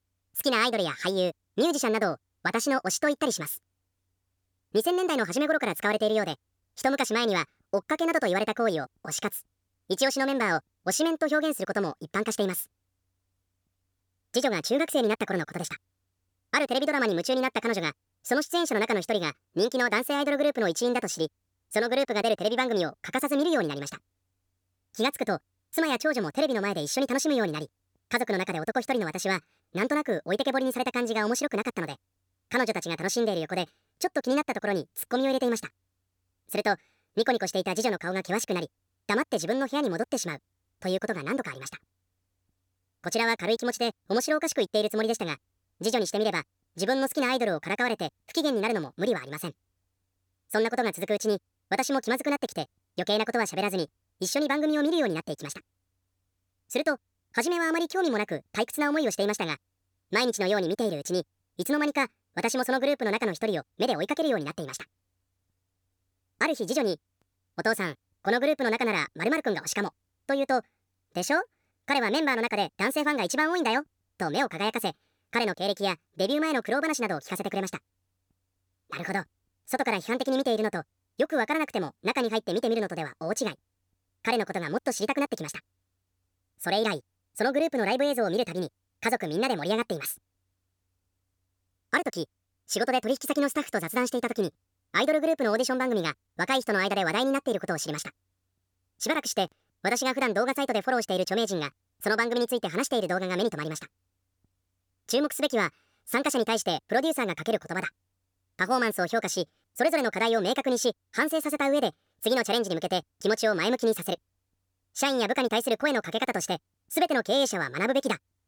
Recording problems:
wrong speed and pitch; too fast and too high; 1.5 times normal speed

